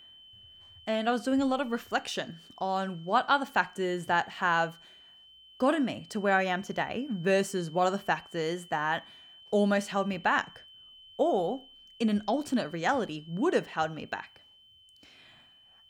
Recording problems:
high-pitched whine; faint; throughout; 3 kHz, 20 dB below the speech

